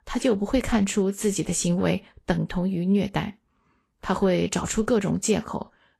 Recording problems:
garbled, watery; slightly; nothing above 12.5 kHz

